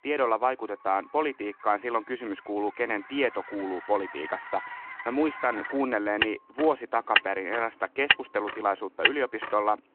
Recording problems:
phone-call audio
traffic noise; loud; throughout; 1 dB below the speech

